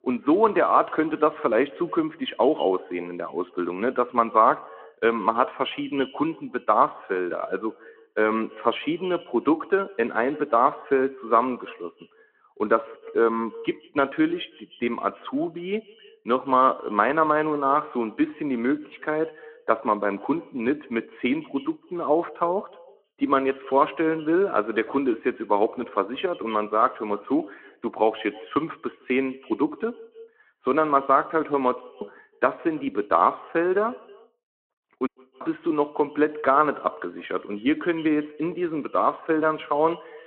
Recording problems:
muffled; very; fading above 2 kHz
echo of what is said; faint; throughout; 160 ms later, 20 dB below the speech
phone-call audio
audio cutting out; at 32 s and at 35 s

